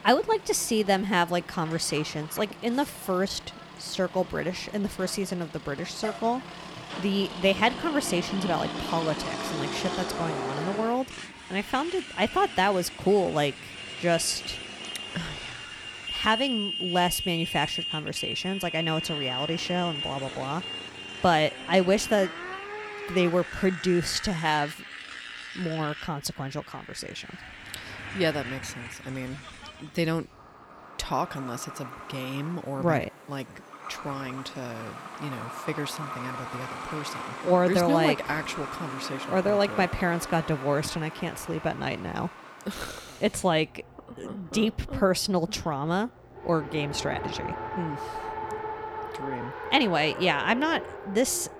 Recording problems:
traffic noise; loud; throughout; 8 dB below the speech

